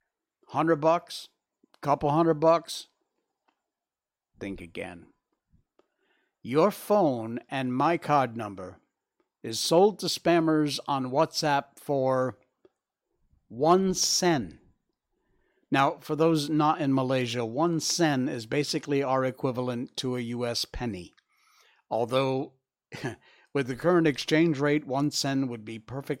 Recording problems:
none

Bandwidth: 16 kHz